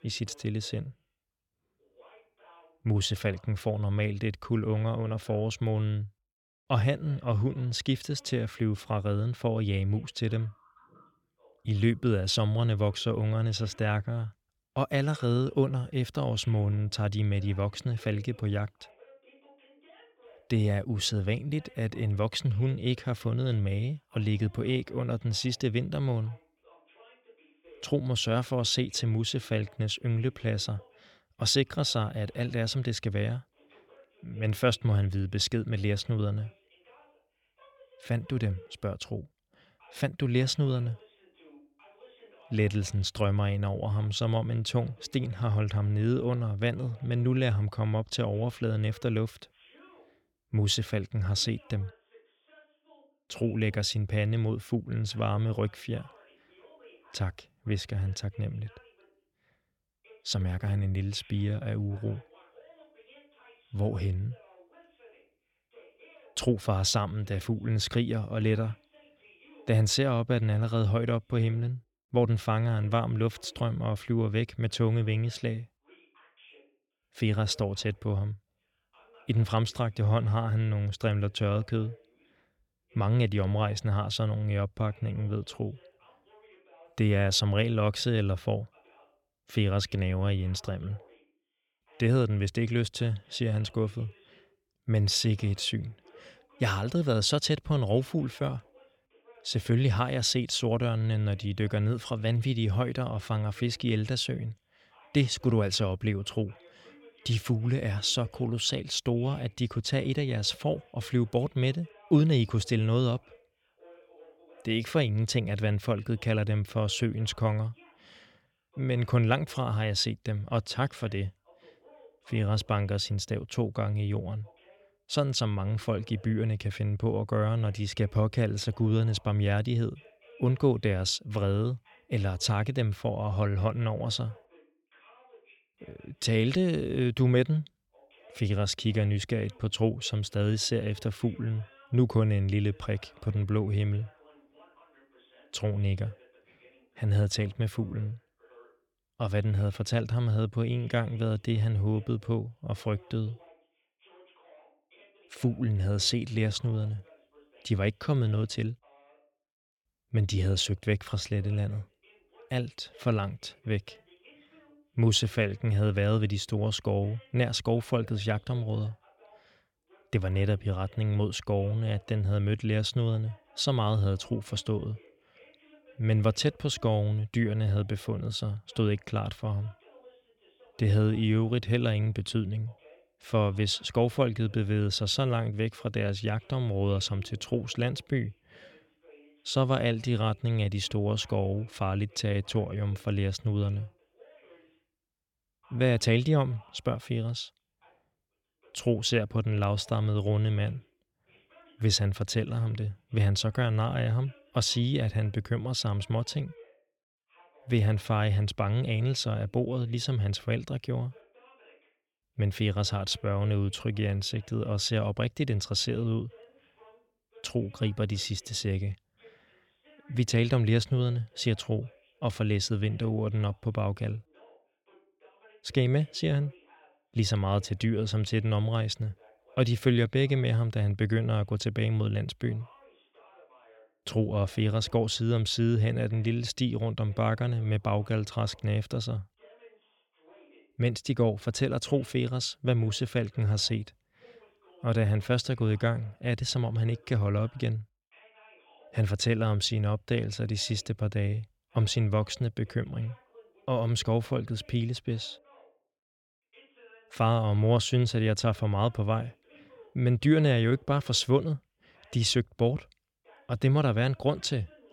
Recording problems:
voice in the background; faint; throughout; 30 dB below the speech

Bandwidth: 17 kHz